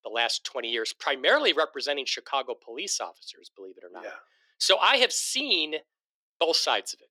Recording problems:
thin; somewhat; fading below 350 Hz

